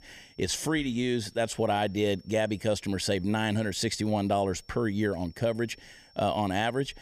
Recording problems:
high-pitched whine; faint; throughout; 5.5 kHz, 30 dB below the speech

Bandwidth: 15 kHz